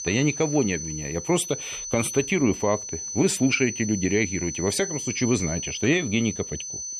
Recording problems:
high-pitched whine; loud; throughout; 6 kHz, 7 dB below the speech

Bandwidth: 14 kHz